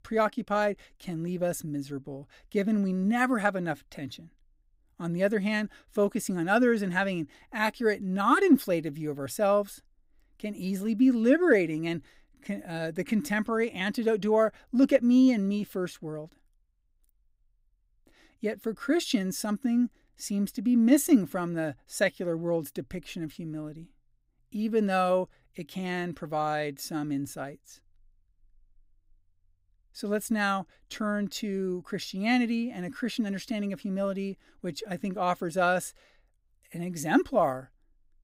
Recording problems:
none

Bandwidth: 15.5 kHz